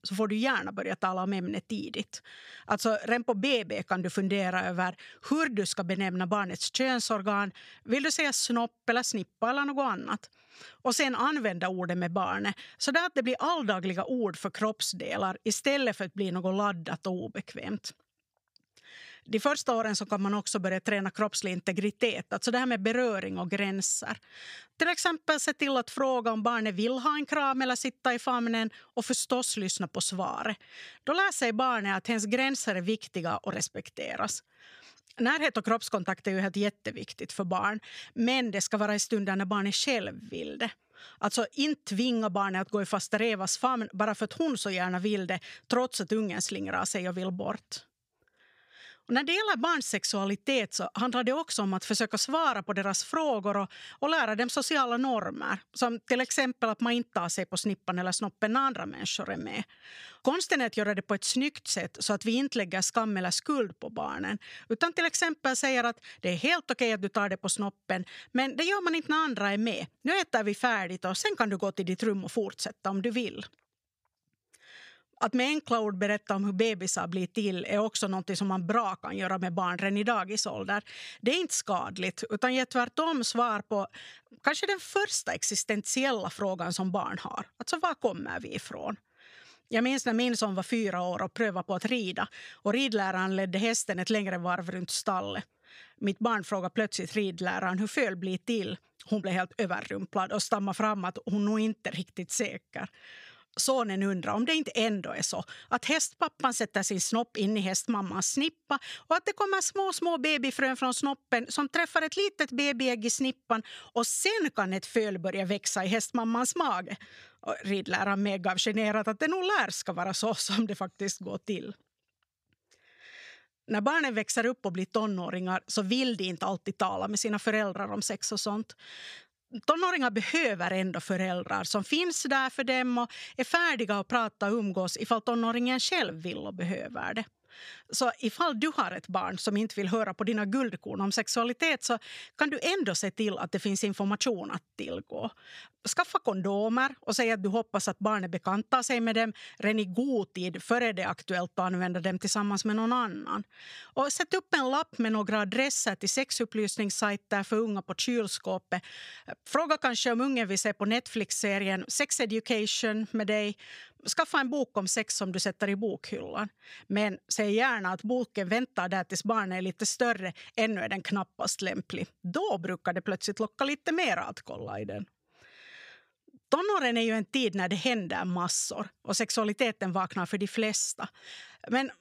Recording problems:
none

